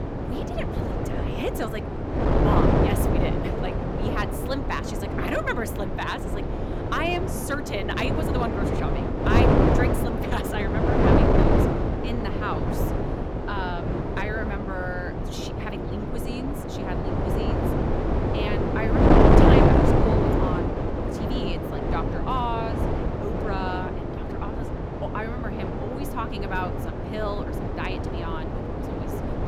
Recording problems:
wind noise on the microphone; heavy; 4 dB above the speech

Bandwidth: 18.5 kHz